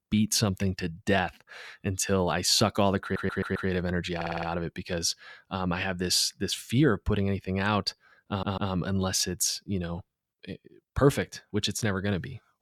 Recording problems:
audio stuttering; at 3 s, at 4 s and at 8.5 s

